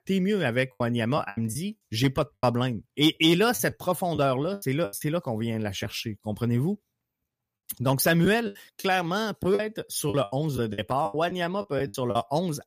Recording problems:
choppy; very; 10% of the speech affected

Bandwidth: 15 kHz